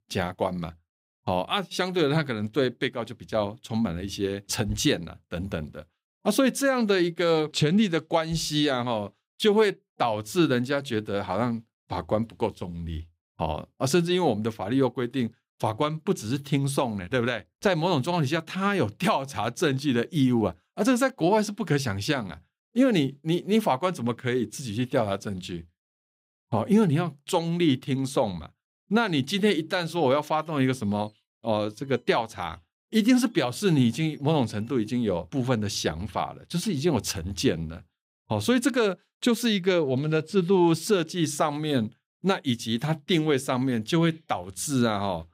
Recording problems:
none

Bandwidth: 15.5 kHz